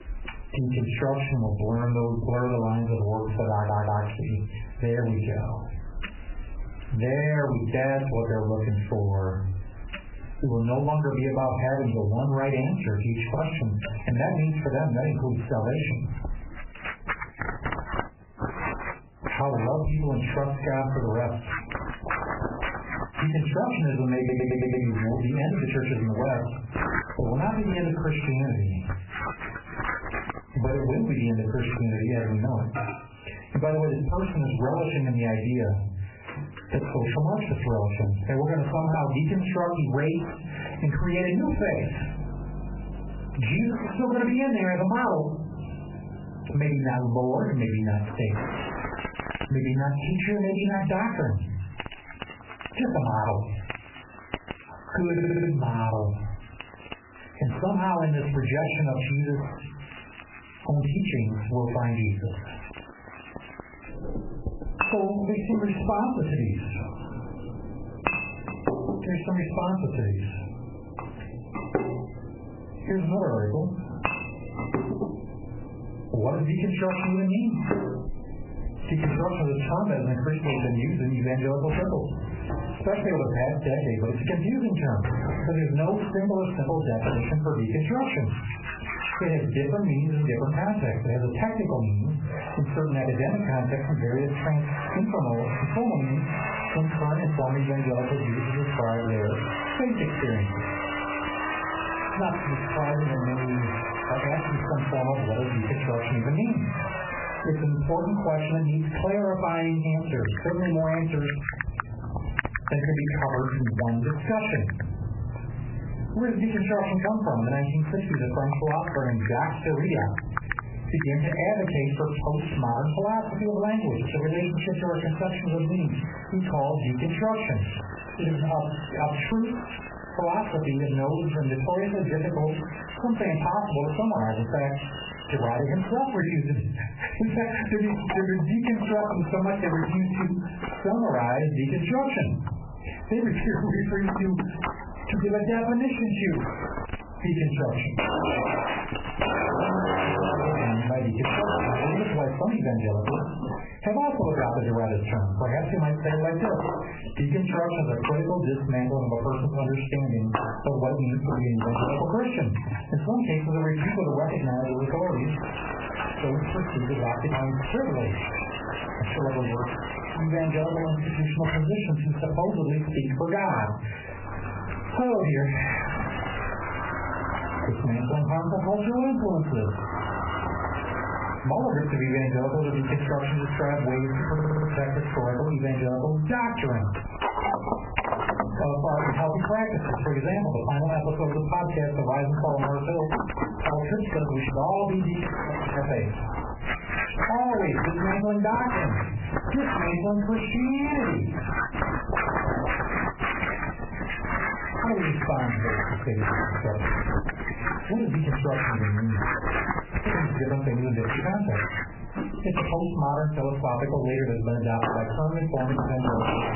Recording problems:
off-mic speech; far
garbled, watery; badly; nothing above 2.5 kHz
distortion; slight; 9 dB below the speech
room echo; very slight; dies away in 0.3 s
squashed, flat; somewhat, background pumping
household noises; loud; throughout; 7 dB below the speech
audio stuttering; 4 times, first at 3.5 s

